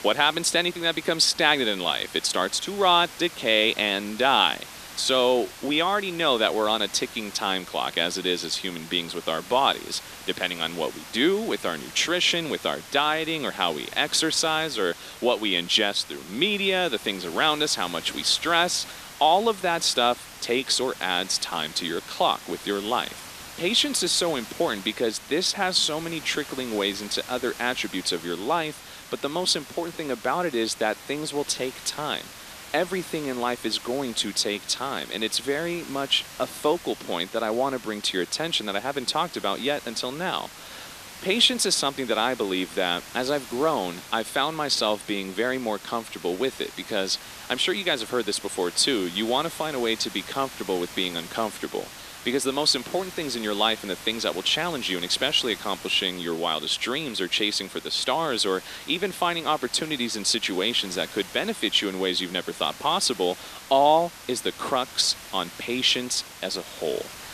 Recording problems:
thin; somewhat; fading below 300 Hz
hiss; noticeable; throughout; 15 dB below the speech

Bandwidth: 14.5 kHz